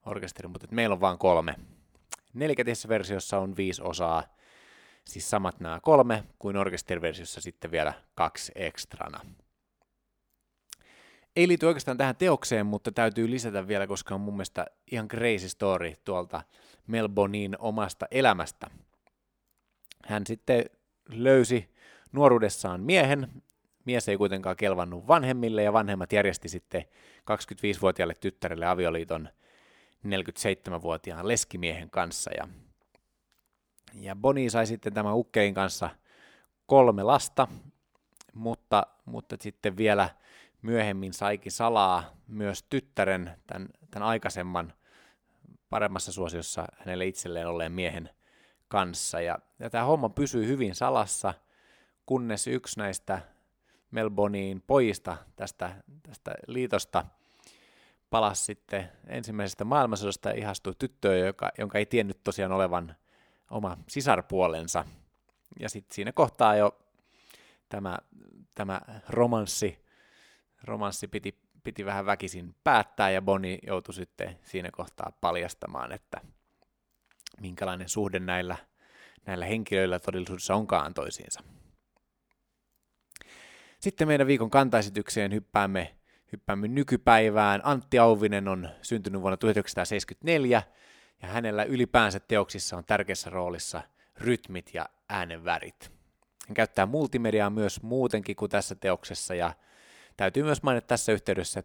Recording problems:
none

